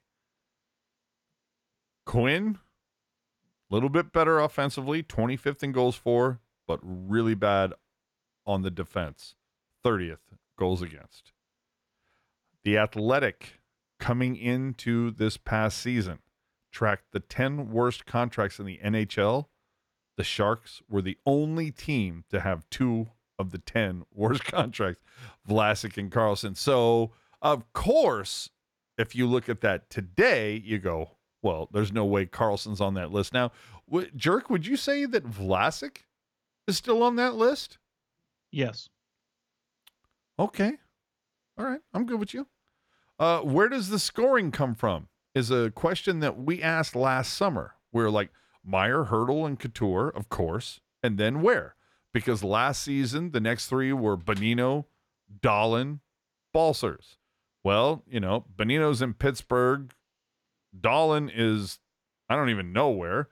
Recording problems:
none

